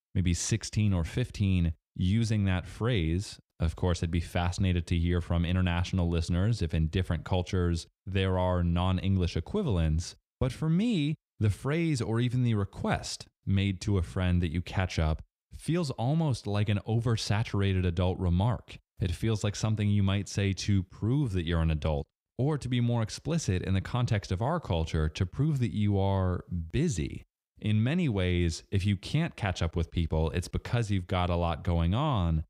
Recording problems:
none

